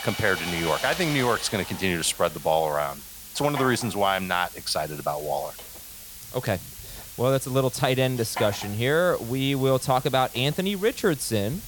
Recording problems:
machinery noise; noticeable; throughout; 10 dB below the speech
hiss; noticeable; throughout; 15 dB below the speech

